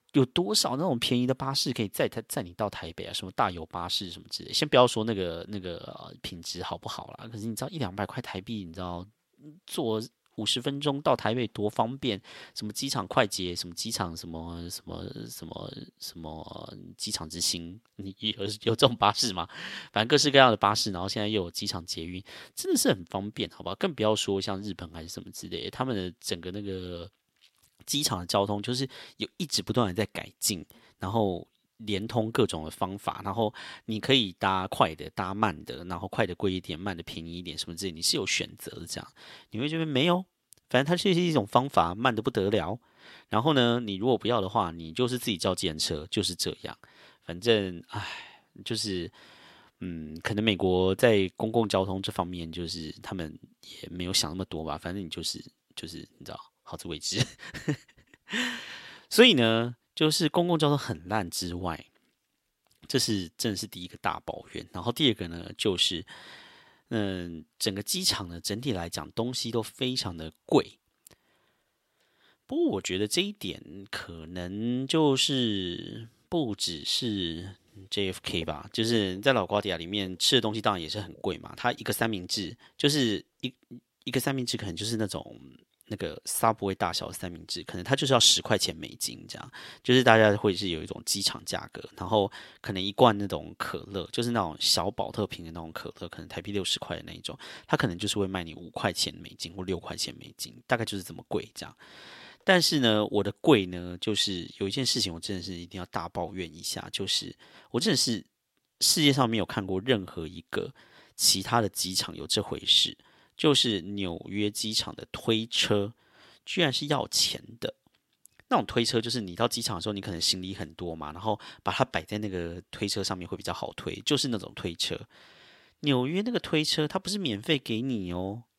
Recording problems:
thin; somewhat; fading below 1 kHz

